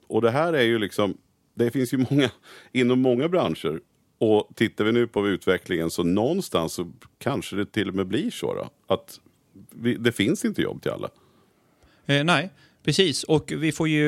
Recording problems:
abrupt cut into speech; at the end

